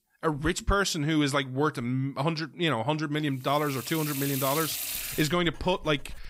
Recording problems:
household noises; loud; from 4 s on; 5 dB below the speech

